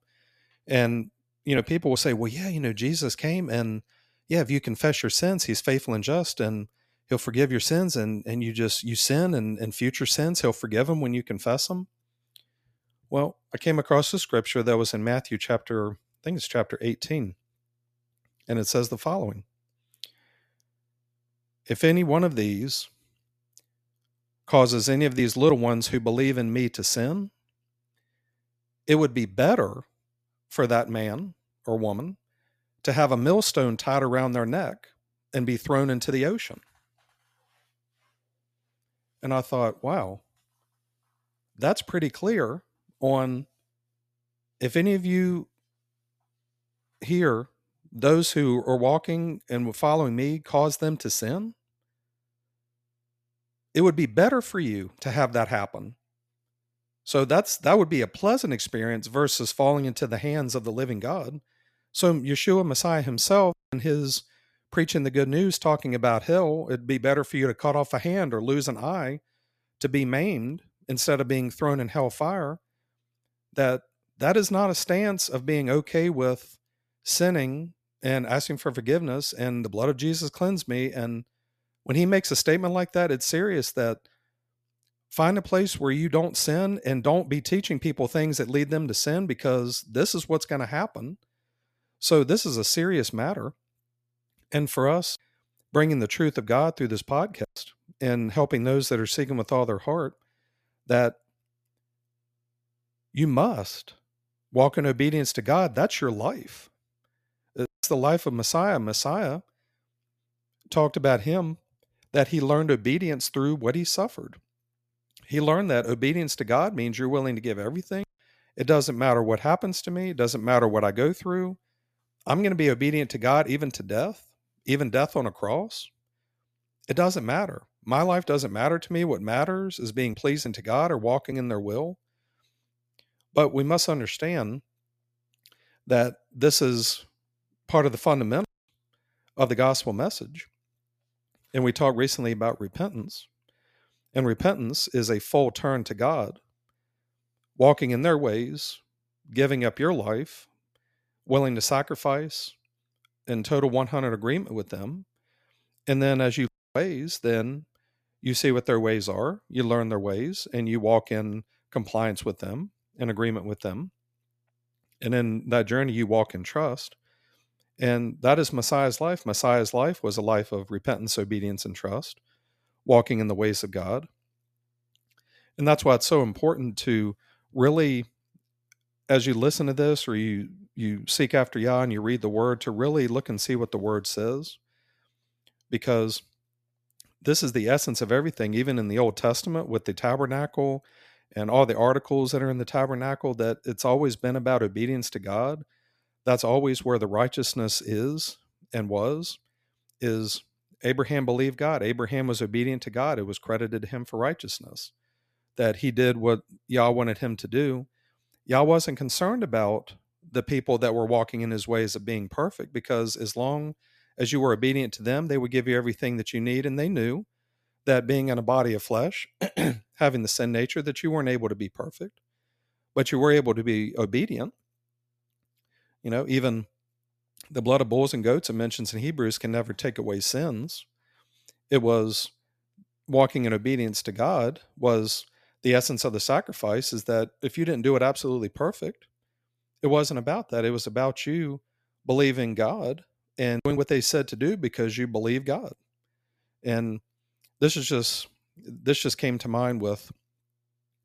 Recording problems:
none

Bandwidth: 14.5 kHz